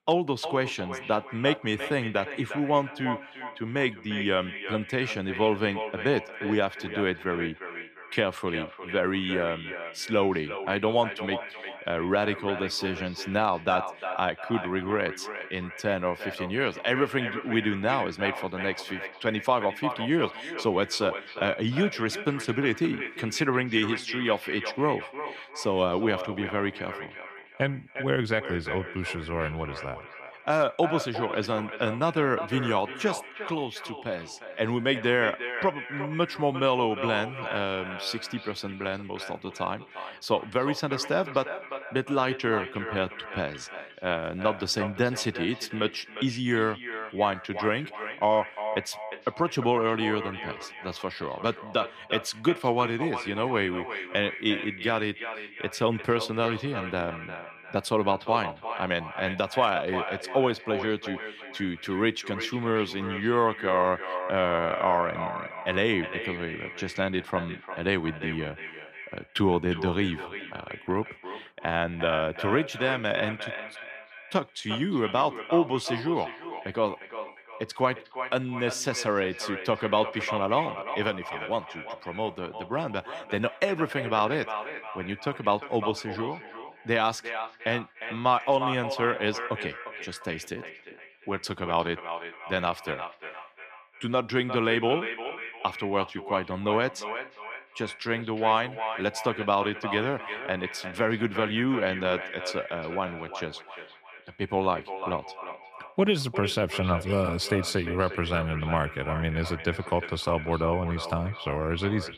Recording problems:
echo of what is said; strong; throughout; 350 ms later, 9 dB below the speech

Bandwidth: 14.5 kHz